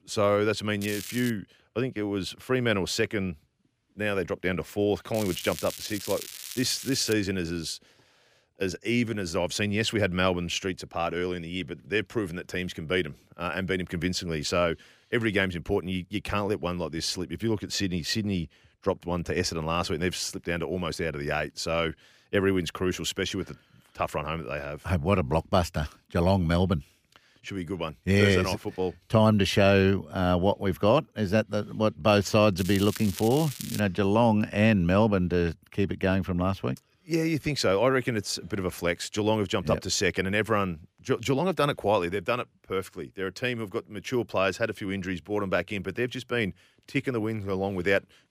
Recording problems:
crackling; noticeable; at 1 s, from 5 to 7 s and from 33 to 34 s; 10 dB below the speech

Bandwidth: 15 kHz